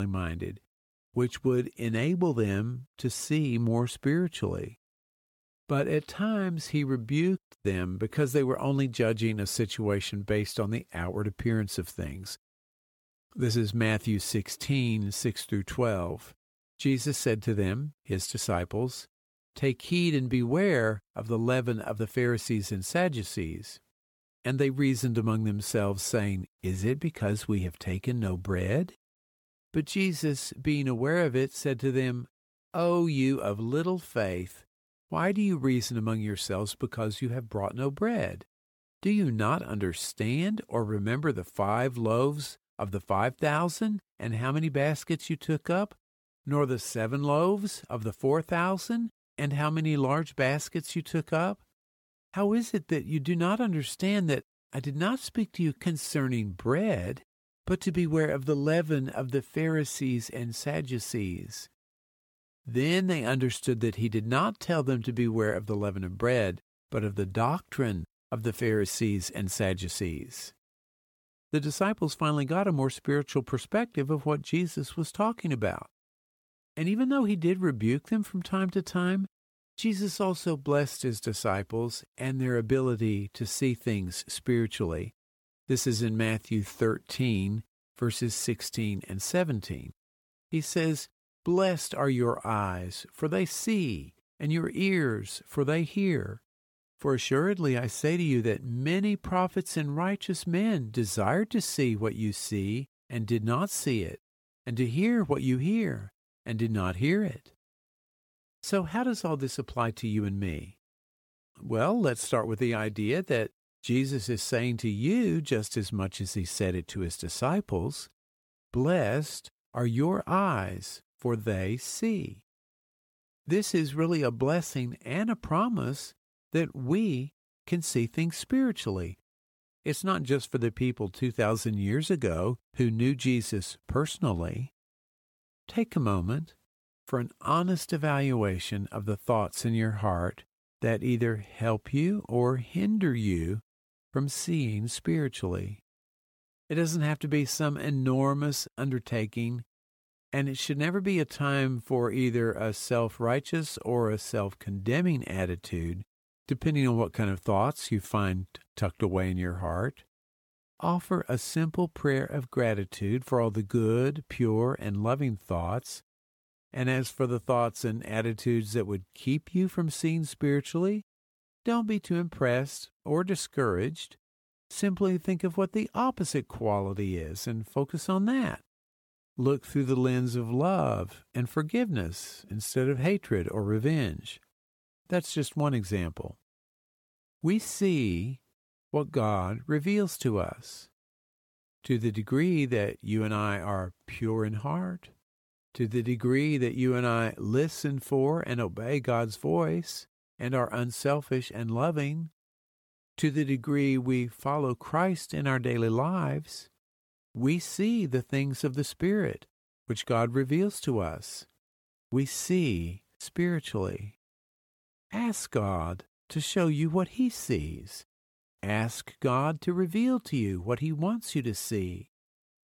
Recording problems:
abrupt cut into speech; at the start

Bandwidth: 17 kHz